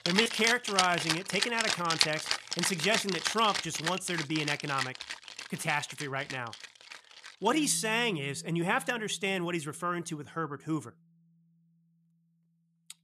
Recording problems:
background music; loud; throughout; 2 dB below the speech

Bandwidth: 14 kHz